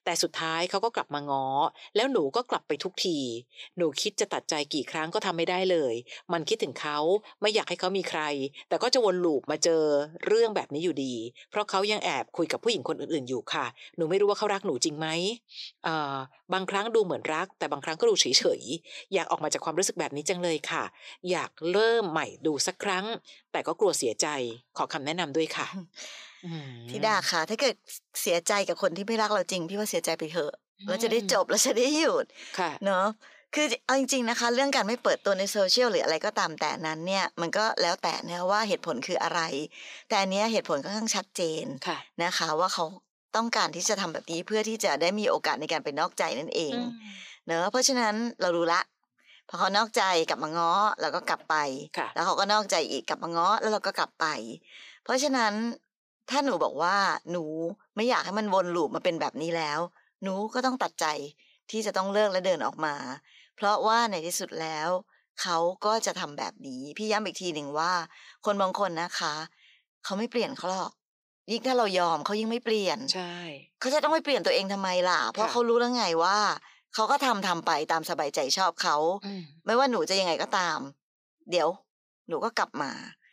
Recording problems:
thin; somewhat; fading below 450 Hz

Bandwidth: 15 kHz